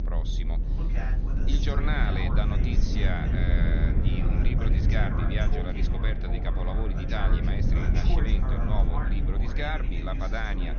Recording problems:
echo of what is said; noticeable; throughout; 540 ms later, 15 dB below the speech
high frequencies cut off; noticeable; nothing above 6.5 kHz
voice in the background; loud; throughout; 6 dB below the speech
low rumble; loud; throughout; 5 dB below the speech

